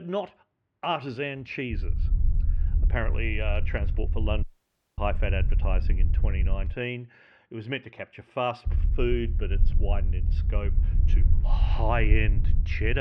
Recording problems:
muffled; slightly; fading above 2 kHz
low rumble; noticeable; from 1.5 to 6.5 s and from 8.5 s on; 15 dB below the speech
abrupt cut into speech; at the start and the end
audio cutting out; at 4.5 s for 0.5 s

